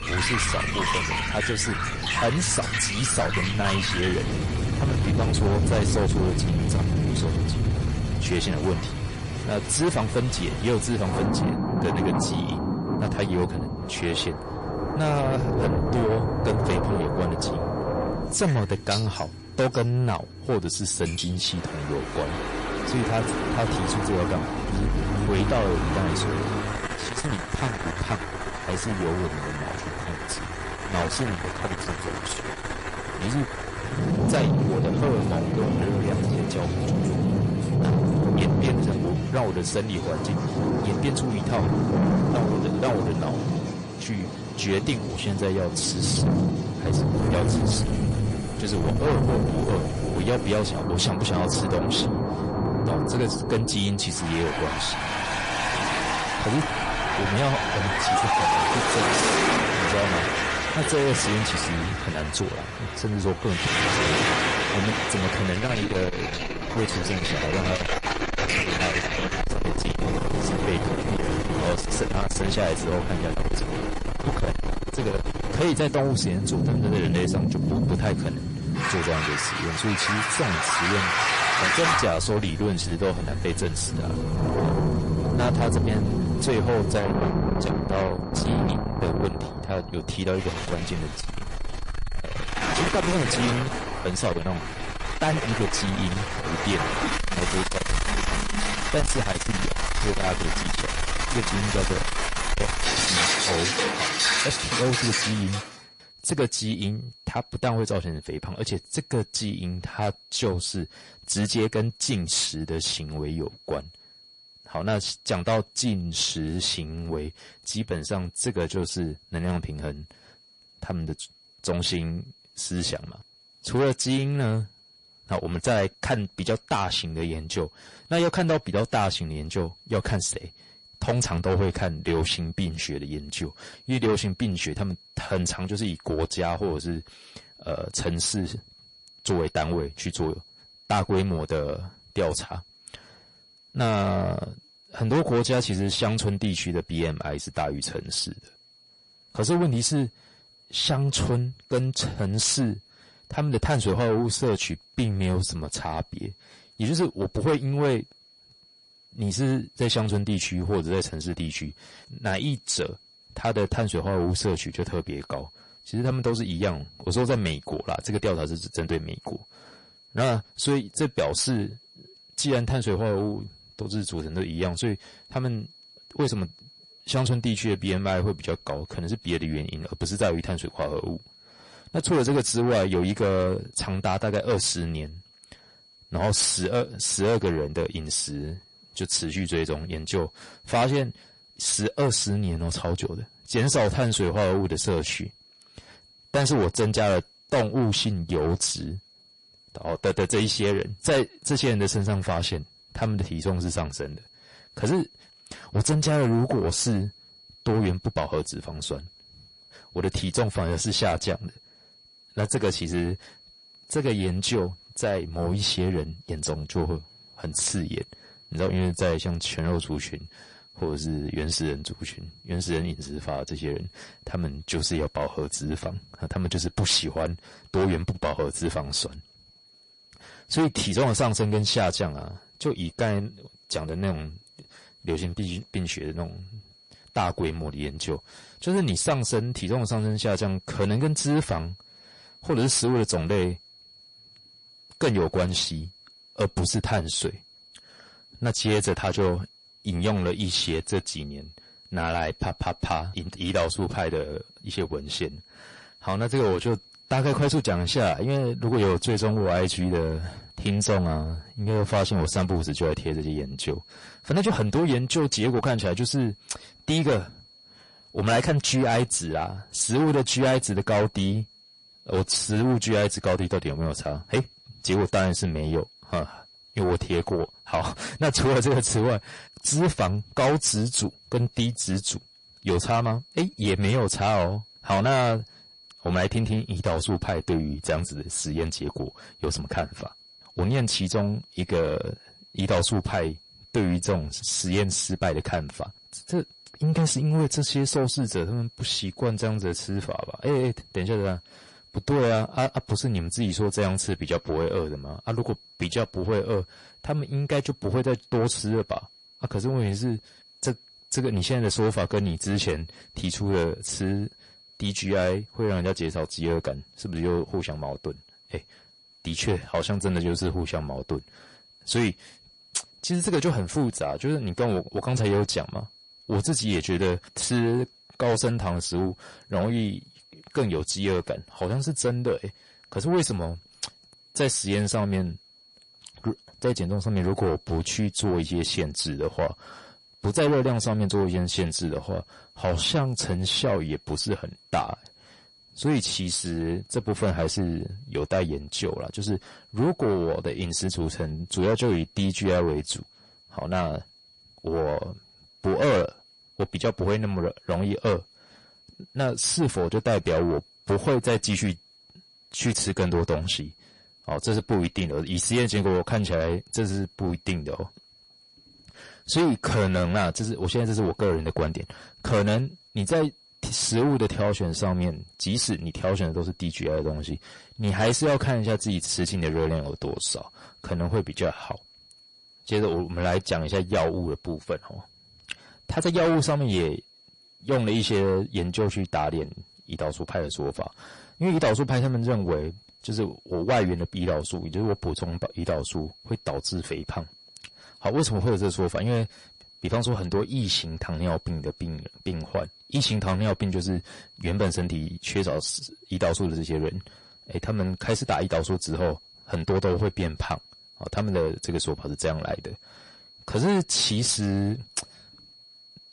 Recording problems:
distortion; heavy; 8 dB below the speech
garbled, watery; slightly; nothing above 10.5 kHz
rain or running water; very loud; until 1:45; 1 dB above the speech
high-pitched whine; faint; throughout; 4.5 kHz, 25 dB below the speech

